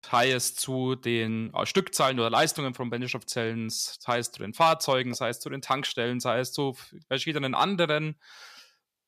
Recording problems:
none

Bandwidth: 14.5 kHz